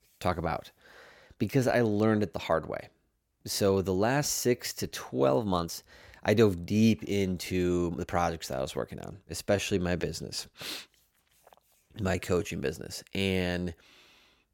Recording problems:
uneven, jittery; strongly; from 1.5 to 13 s

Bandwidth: 17 kHz